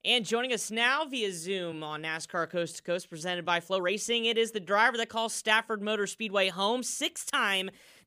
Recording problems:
uneven, jittery; strongly; from 1.5 to 7.5 s

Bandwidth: 15 kHz